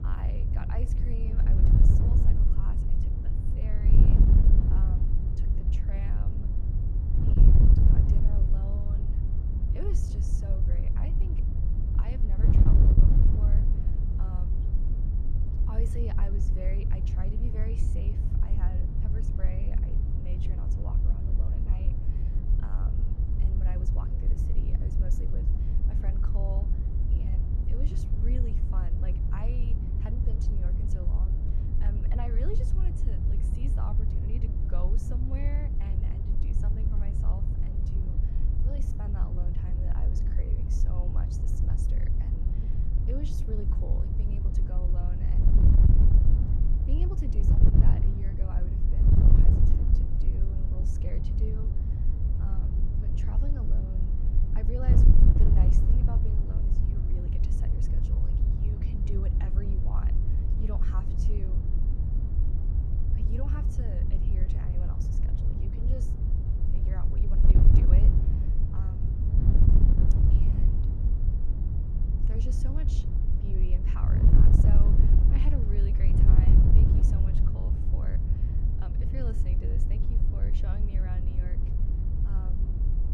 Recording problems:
wind noise on the microphone; heavy; 4 dB above the speech

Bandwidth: 14.5 kHz